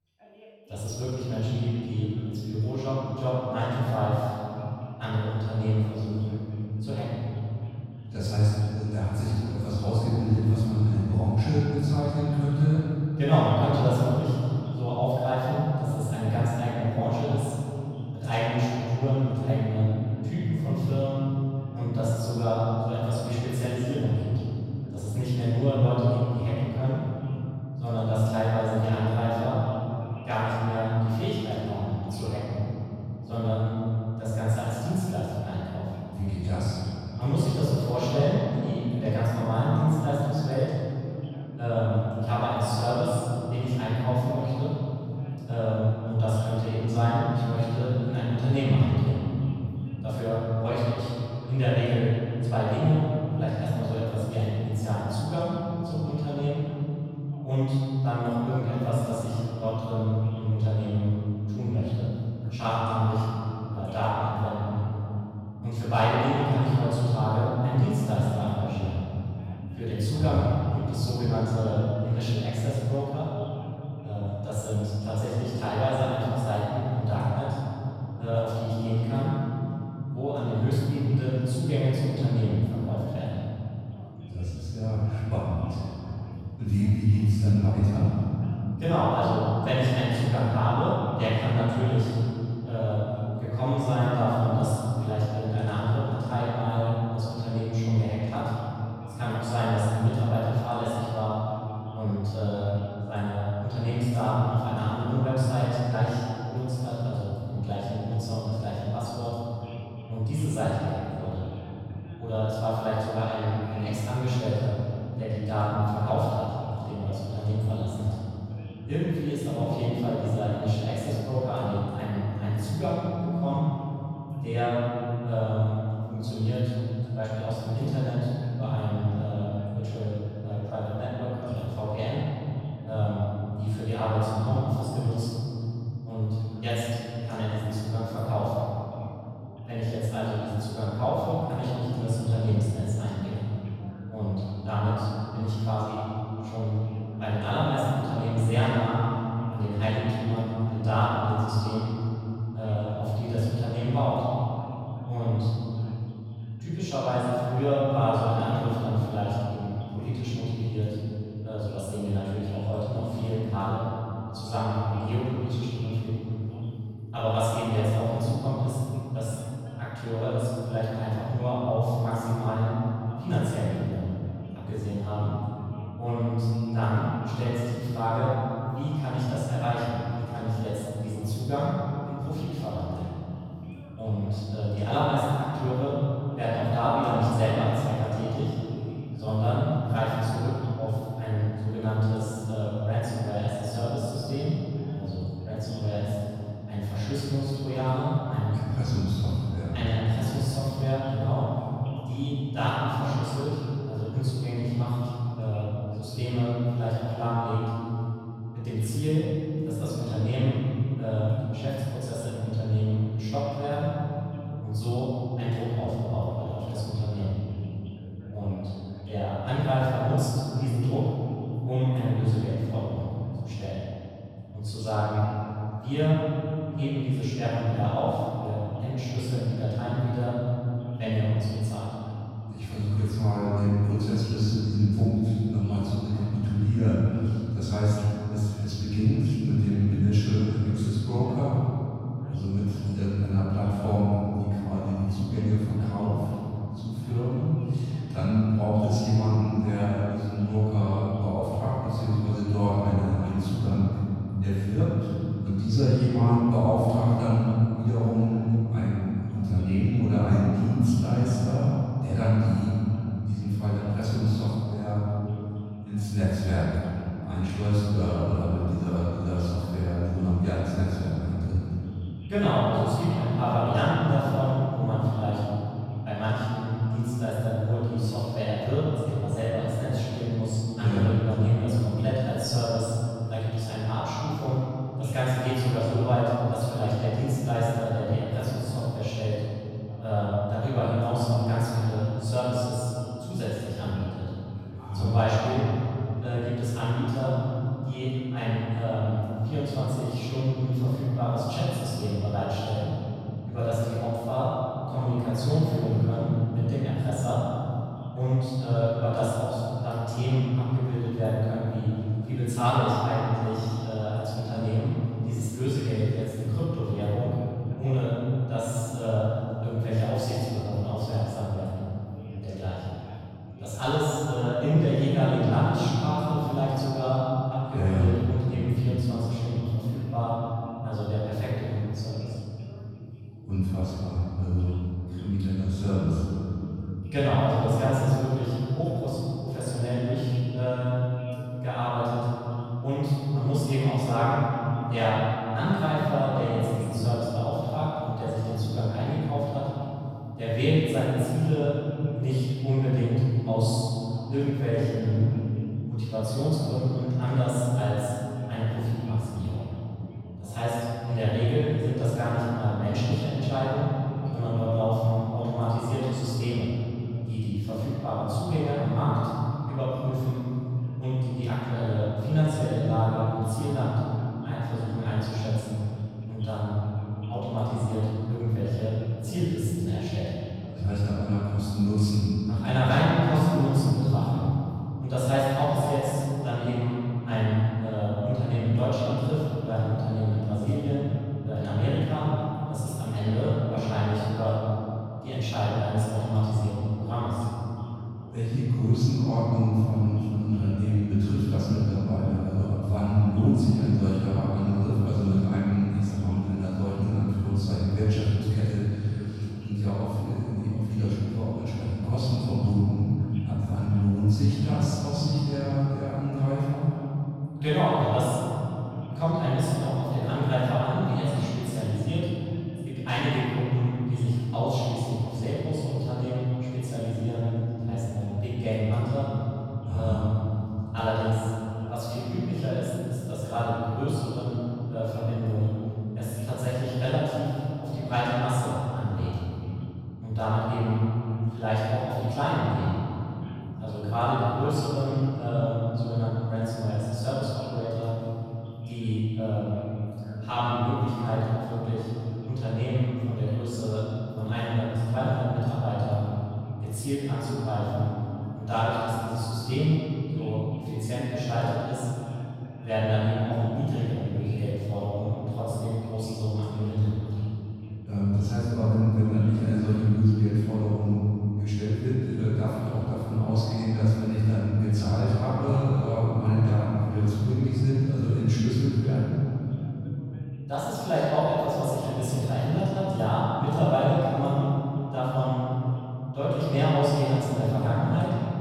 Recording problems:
room echo; strong; dies away in 3 s
off-mic speech; far
voice in the background; faint; throughout; 25 dB below the speech

